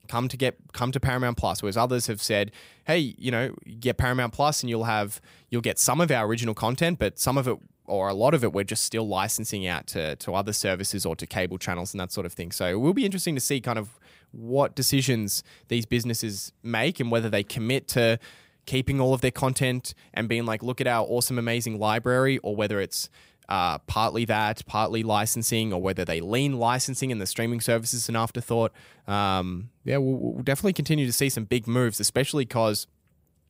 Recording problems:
none

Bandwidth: 15.5 kHz